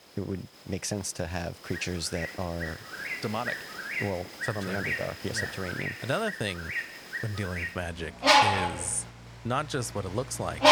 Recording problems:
animal sounds; very loud; throughout; 3 dB above the speech

